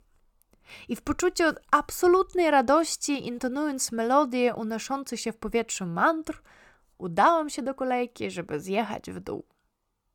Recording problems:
none

